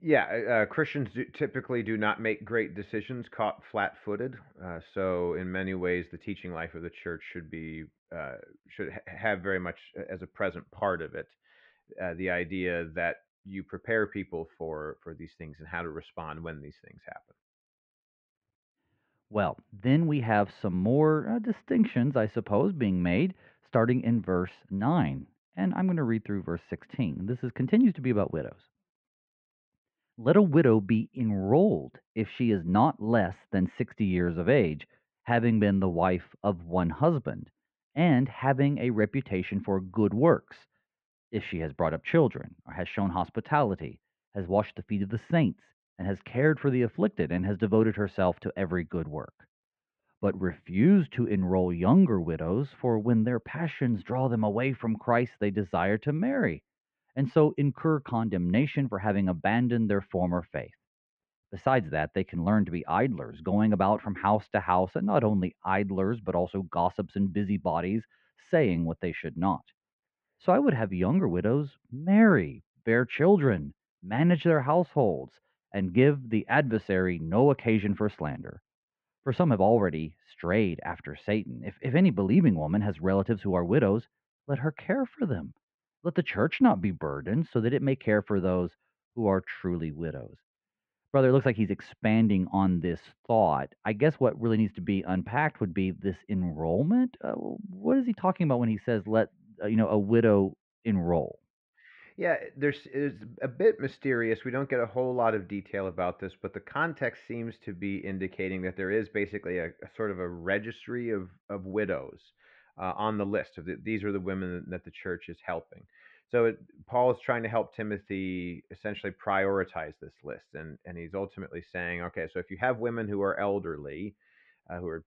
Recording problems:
muffled; very; fading above 2.5 kHz

